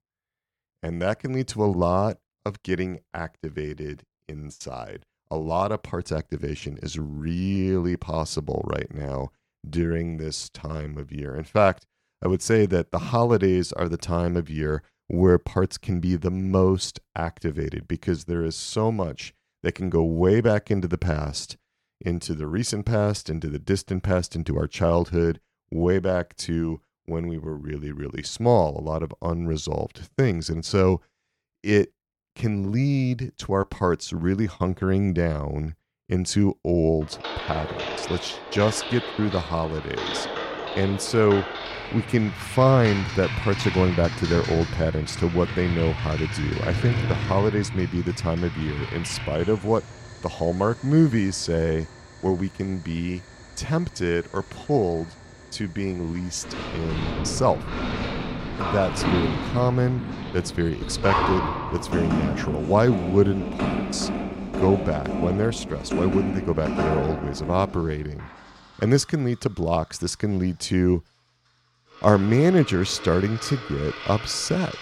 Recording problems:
household noises; loud; from 37 s on; 6 dB below the speech

